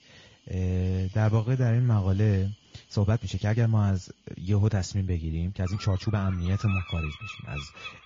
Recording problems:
garbled, watery; slightly
animal sounds; noticeable; throughout; 15 dB below the speech
uneven, jittery; strongly; from 1 to 7.5 s

